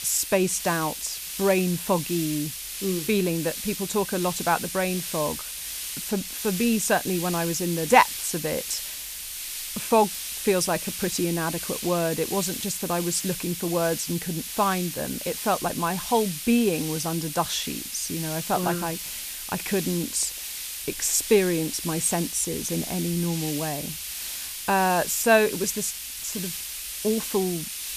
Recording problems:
hiss; loud; throughout; 6 dB below the speech

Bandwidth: 14.5 kHz